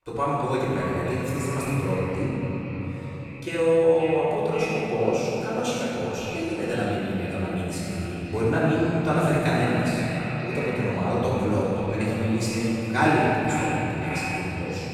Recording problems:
echo of what is said; strong; throughout; 530 ms later, 9 dB below the speech
room echo; strong; dies away in 3 s
off-mic speech; far

